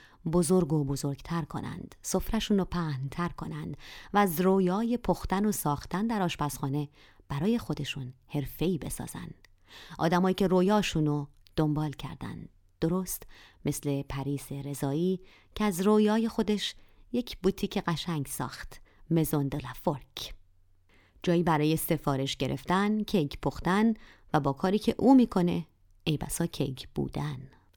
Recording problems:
none

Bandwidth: 18.5 kHz